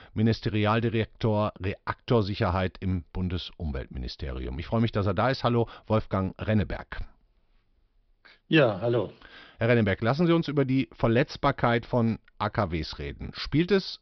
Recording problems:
high frequencies cut off; noticeable; nothing above 5.5 kHz

